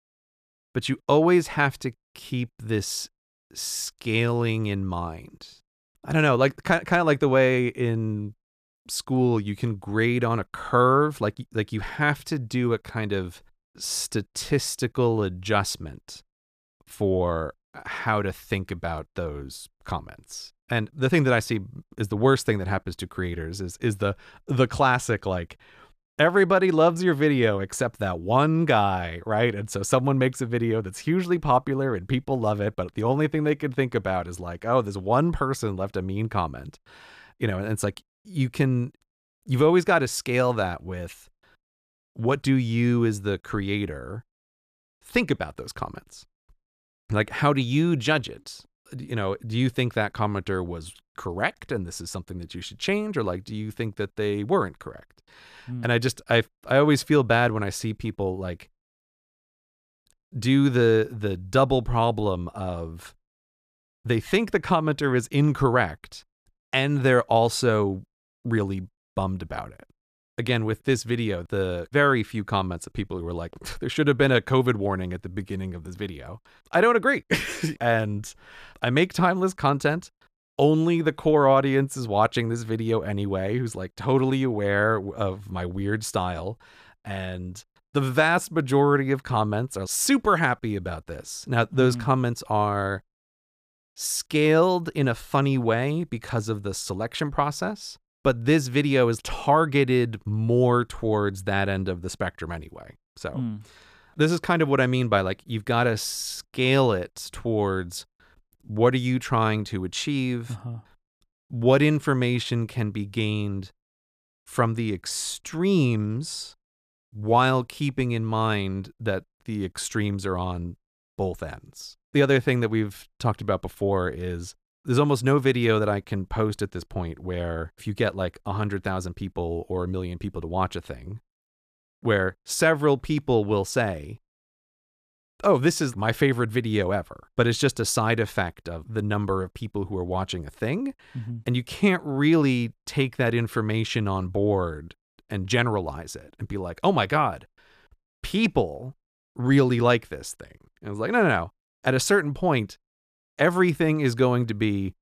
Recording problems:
none

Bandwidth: 14.5 kHz